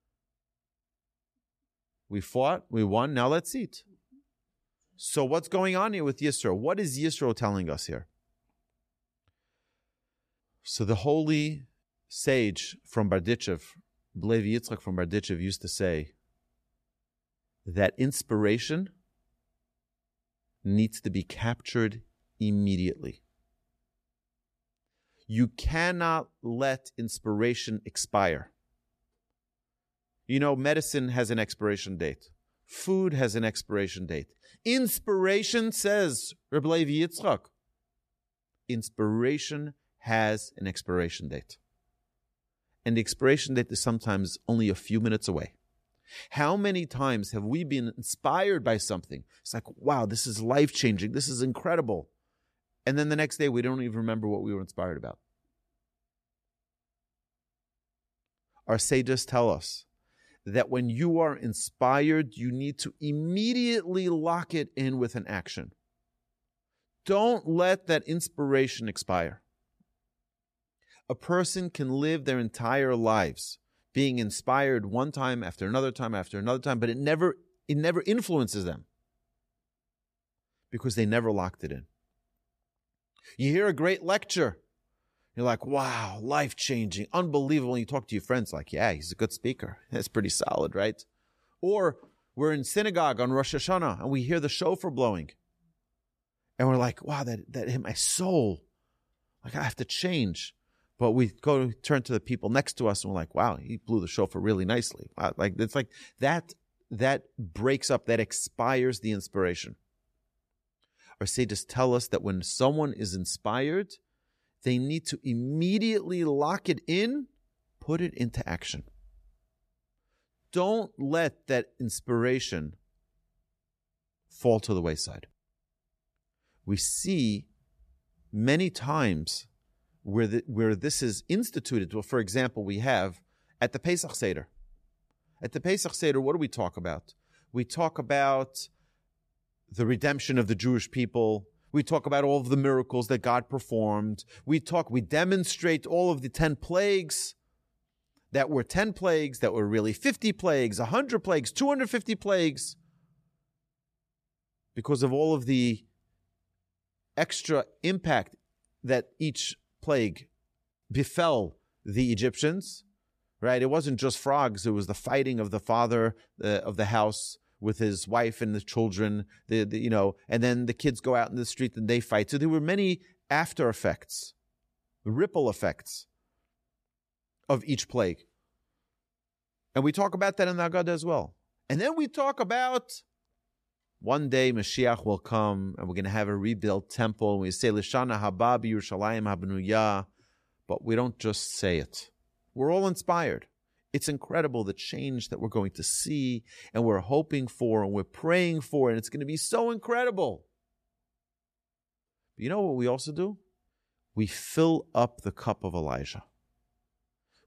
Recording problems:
none

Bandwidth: 14.5 kHz